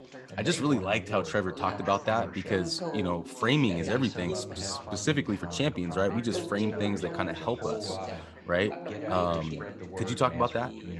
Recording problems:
background chatter; loud; throughout; 3 voices, 8 dB below the speech

